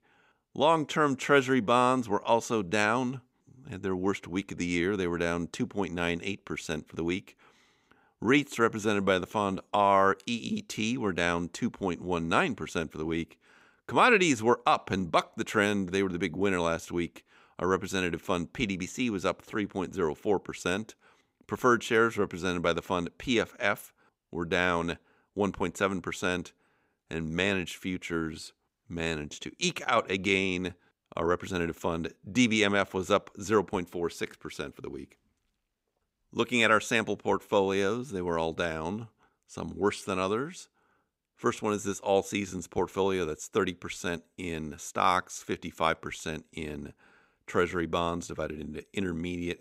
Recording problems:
none

